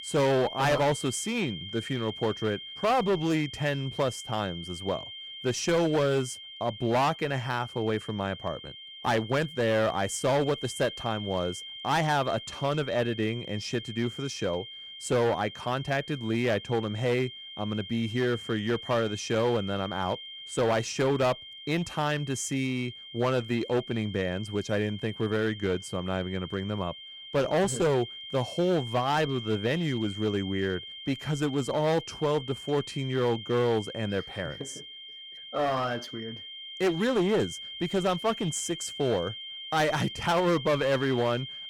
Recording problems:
distortion; slight; 10% of the sound clipped
high-pitched whine; noticeable; throughout; 3 kHz, 10 dB below the speech

